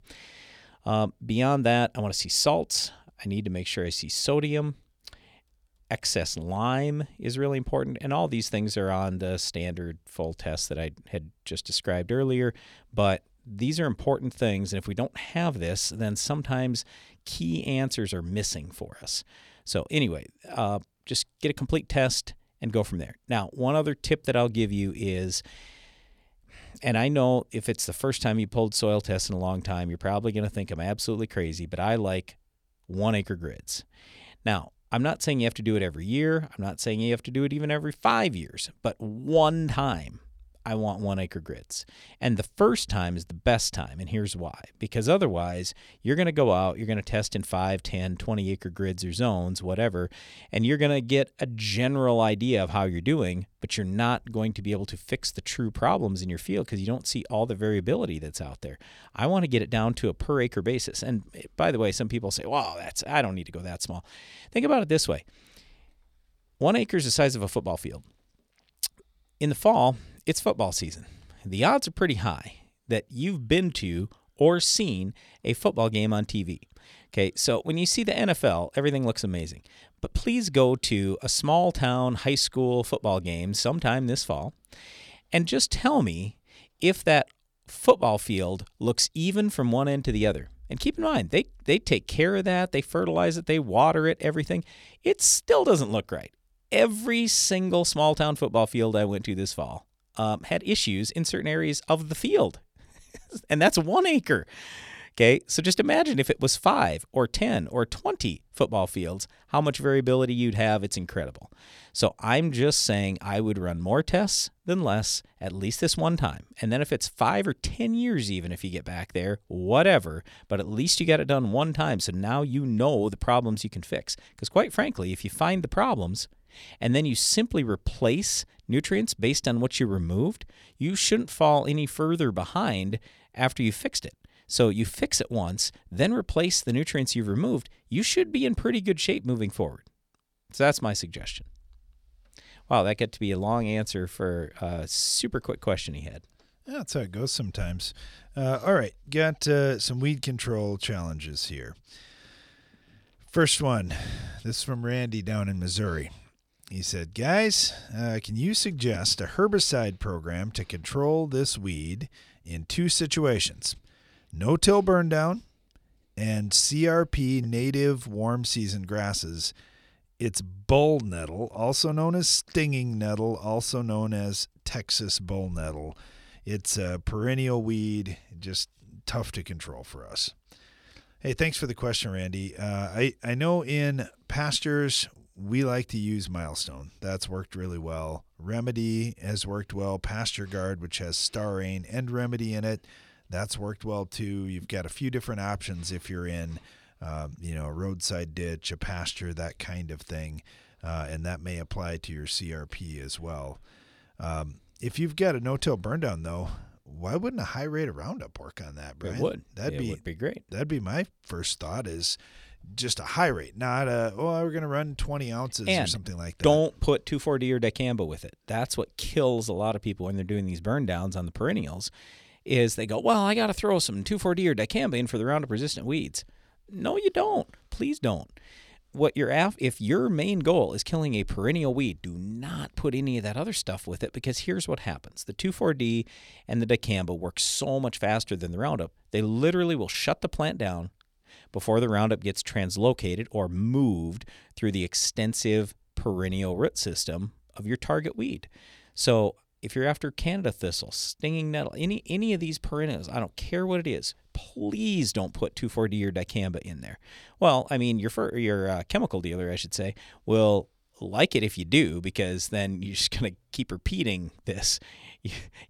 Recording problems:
none

